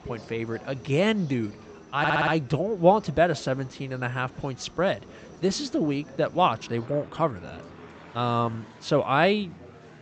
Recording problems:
high frequencies cut off; noticeable; nothing above 8 kHz
train or aircraft noise; faint; throughout; 25 dB below the speech
chatter from many people; faint; throughout; 20 dB below the speech
audio stuttering; at 2 s

